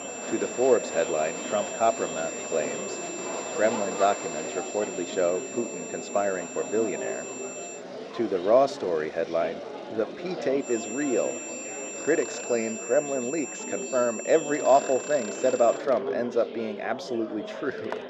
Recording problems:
muffled; slightly; fading above 1.5 kHz
thin; somewhat; fading below 350 Hz
high-pitched whine; loud; until 8 s and from 11 to 16 s; 7.5 kHz, 9 dB below the speech
murmuring crowd; loud; throughout; 10 dB below the speech
machinery noise; noticeable; throughout; 20 dB below the speech

